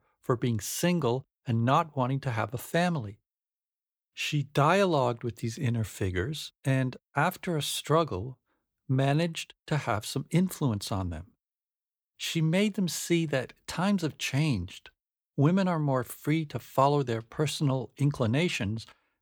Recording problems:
none

